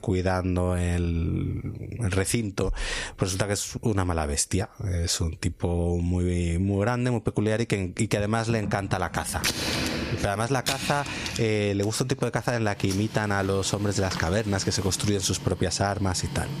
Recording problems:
squashed, flat; heavily, background pumping
household noises; loud; from 8.5 s on; 7 dB below the speech

